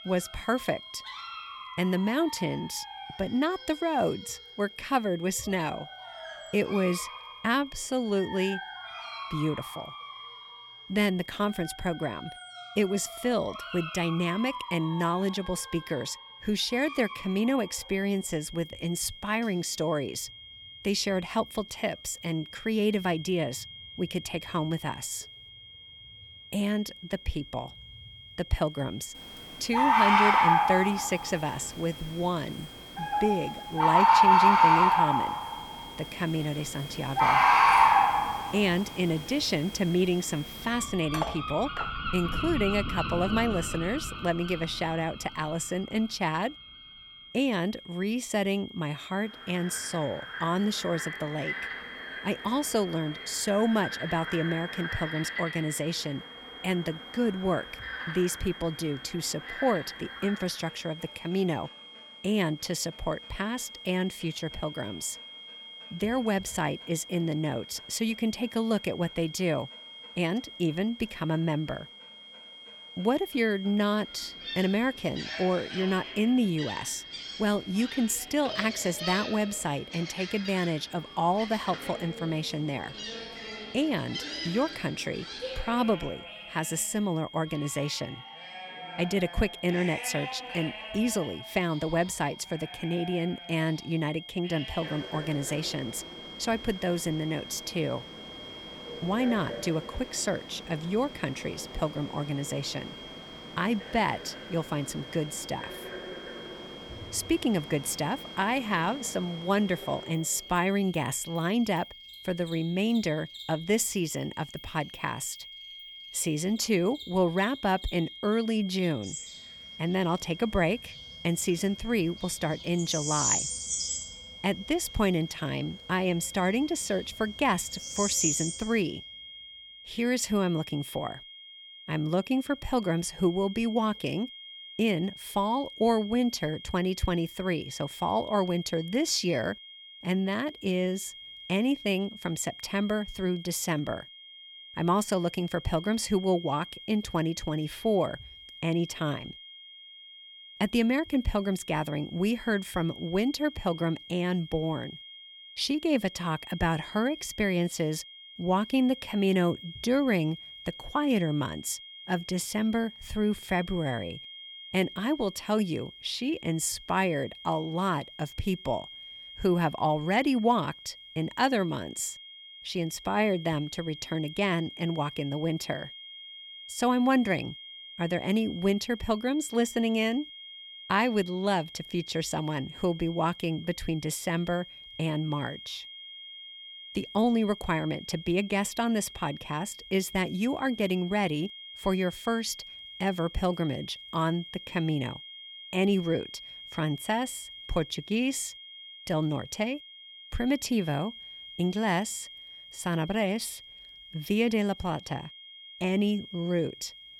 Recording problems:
animal sounds; loud; until 2:09; 1 dB below the speech
high-pitched whine; noticeable; throughout; 3 kHz, 15 dB below the speech
clattering dishes; noticeable; at 41 s; peak 5 dB below the speech

